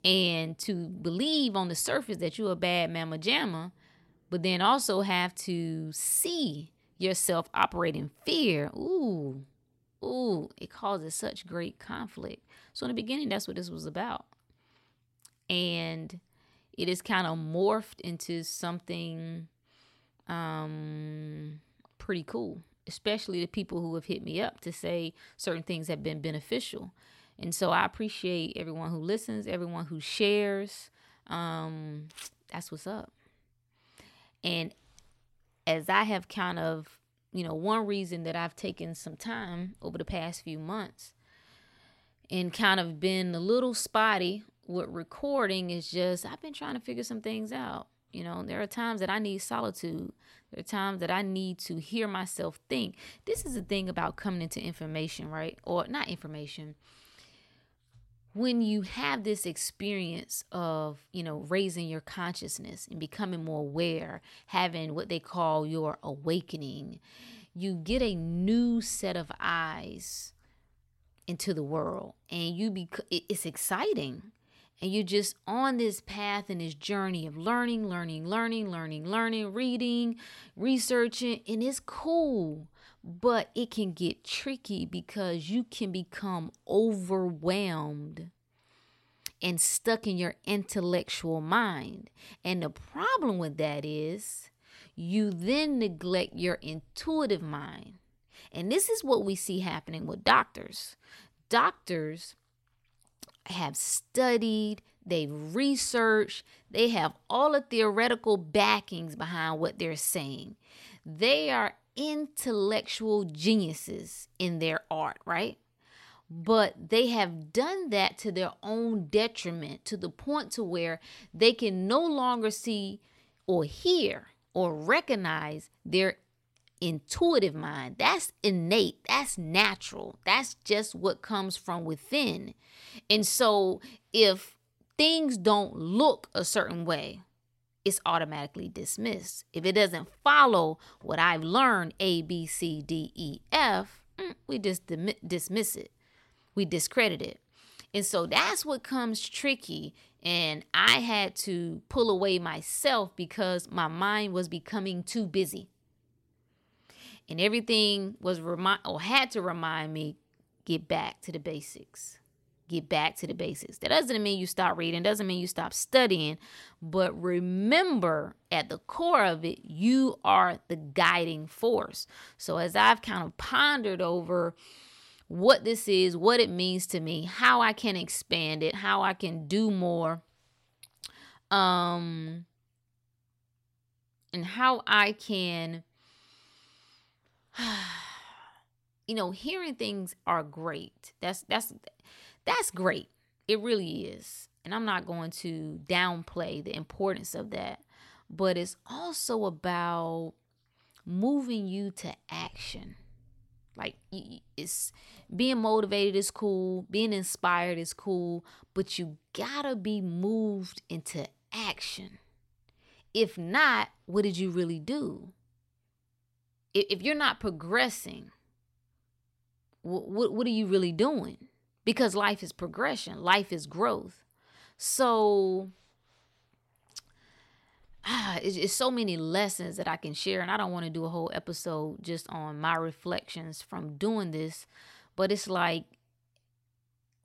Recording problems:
none

